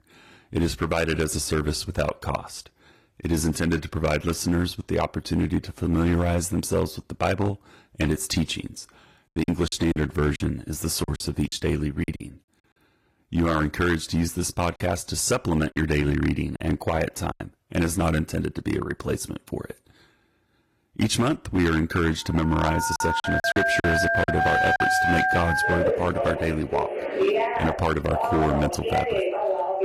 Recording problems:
distortion; slight; 4% of the sound clipped
garbled, watery; slightly; nothing above 14.5 kHz
alarms or sirens; very loud; from 23 s on; 1 dB above the speech
choppy; very; from 9.5 to 12 s, from 15 to 17 s and from 23 to 24 s; 9% of the speech affected

